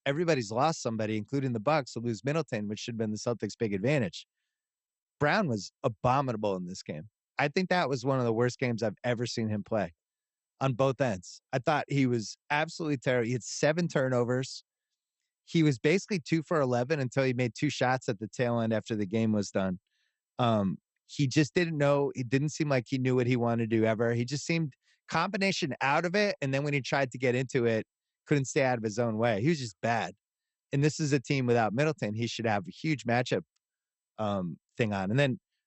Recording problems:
garbled, watery; slightly; nothing above 8 kHz

